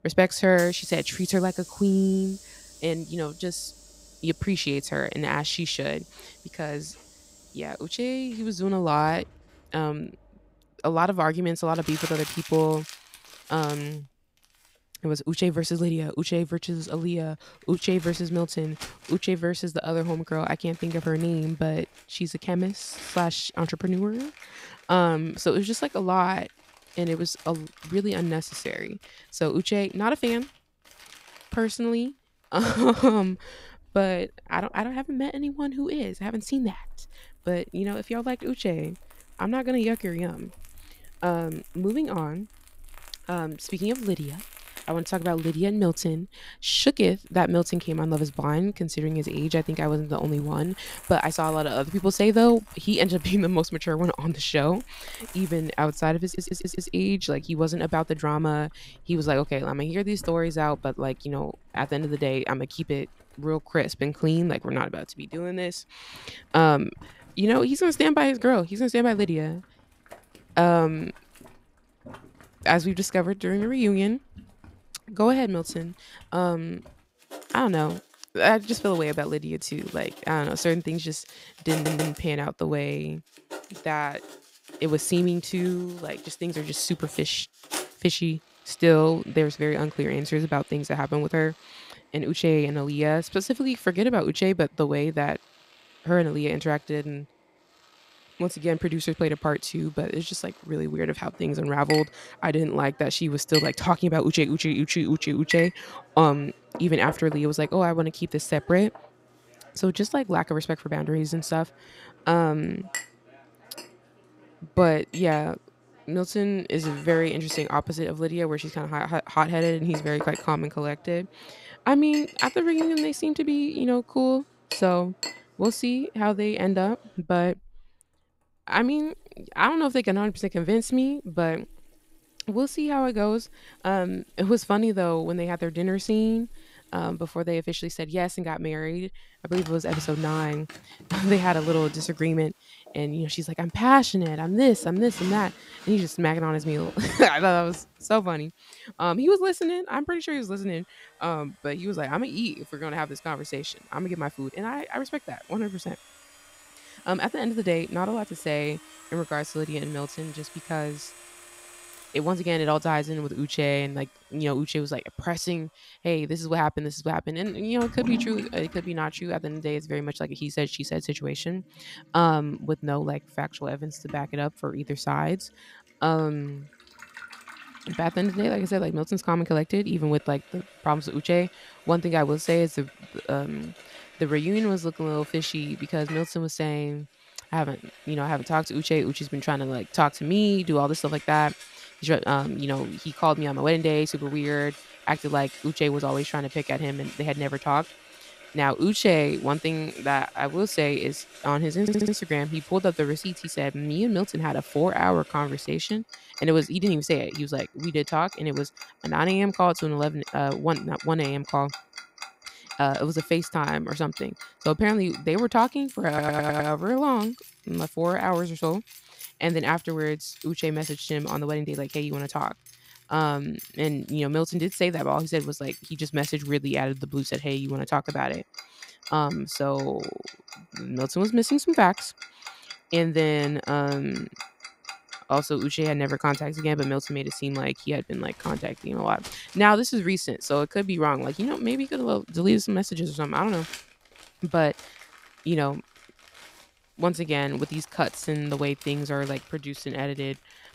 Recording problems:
household noises; noticeable; throughout; 15 dB below the speech
audio stuttering; 4 times, first at 56 s

